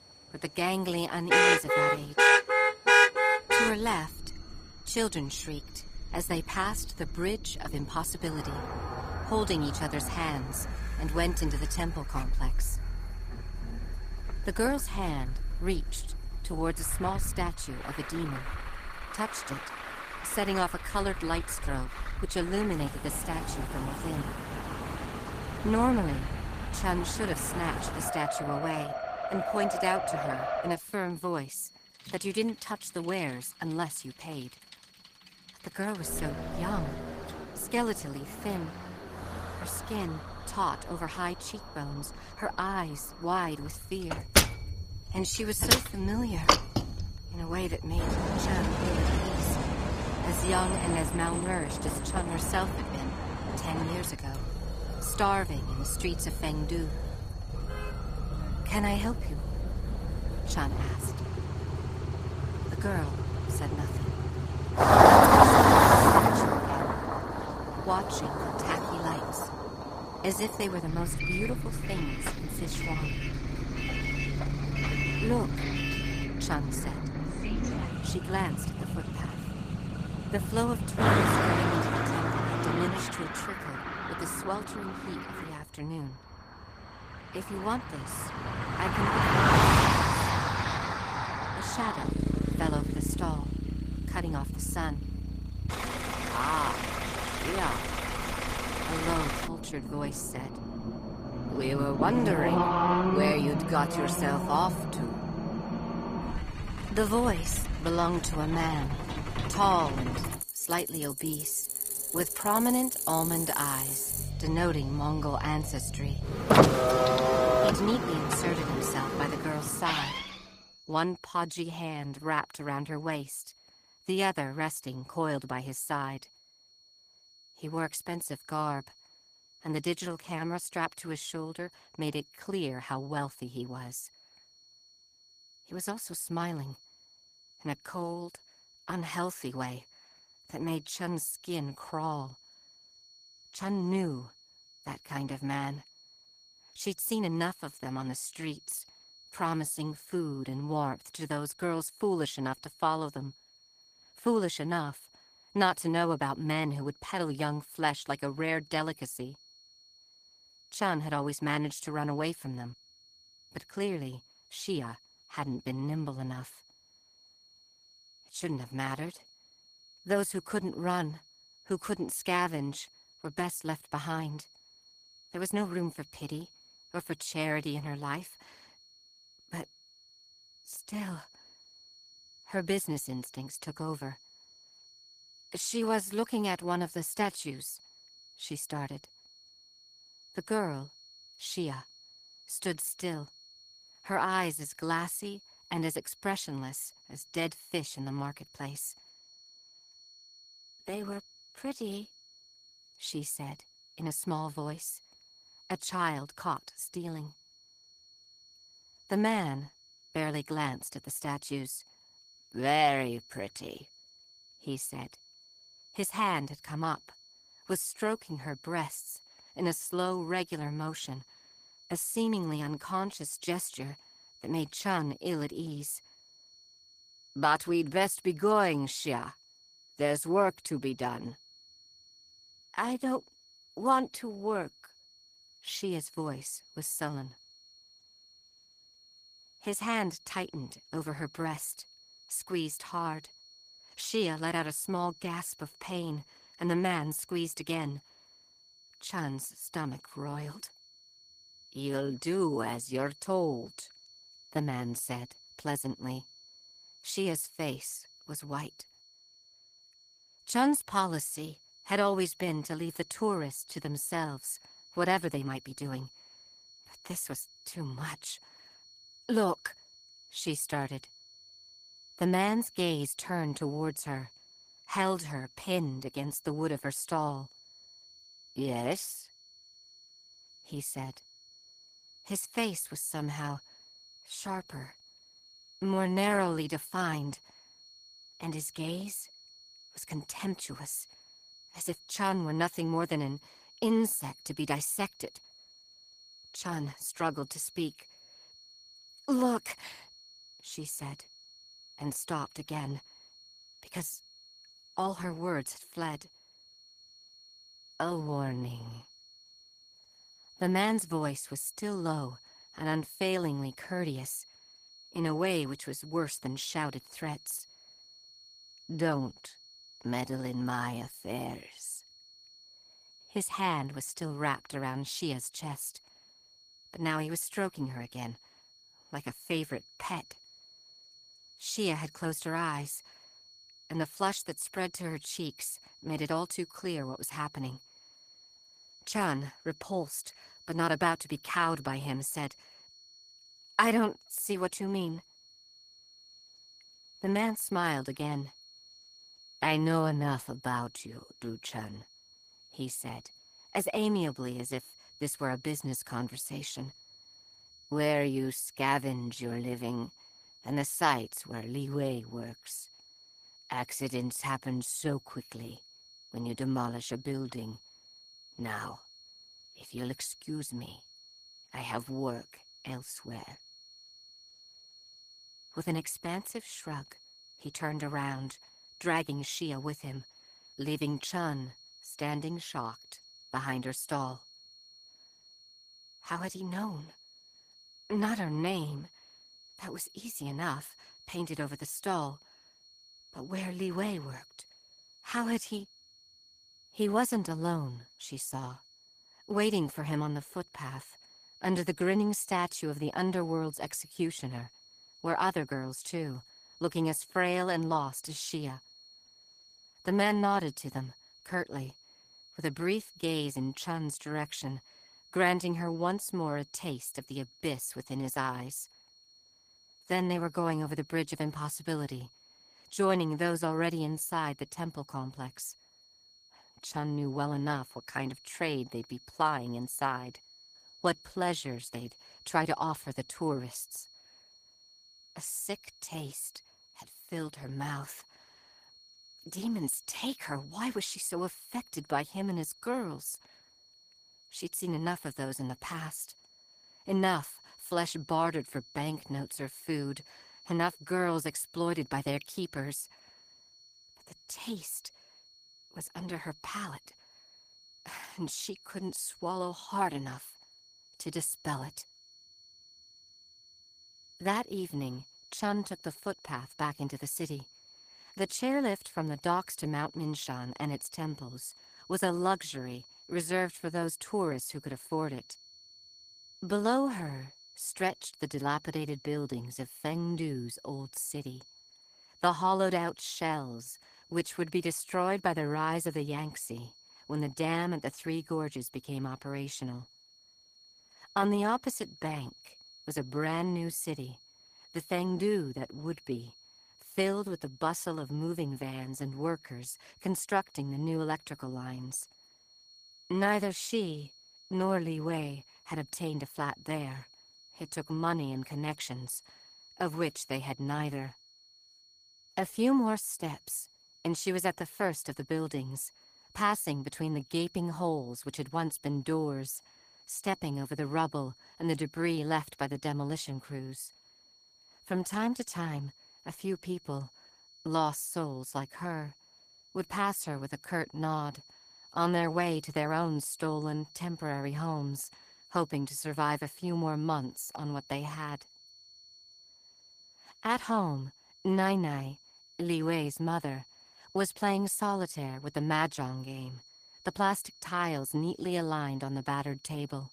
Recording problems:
garbled, watery; slightly; nothing above 15 kHz
traffic noise; very loud; until 2:00; 6 dB above the speech
high-pitched whine; noticeable; throughout; 4.5 kHz, 20 dB below the speech

